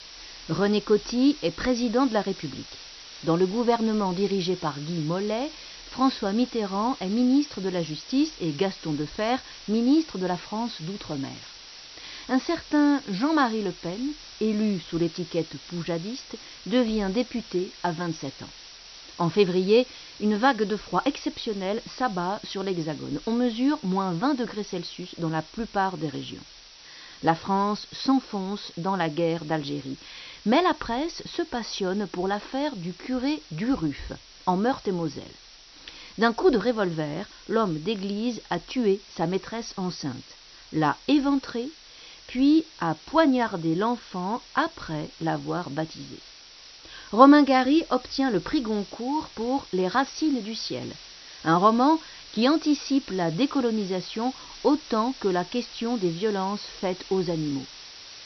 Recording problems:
high frequencies cut off; noticeable; nothing above 6 kHz
hiss; noticeable; throughout; 15 dB below the speech

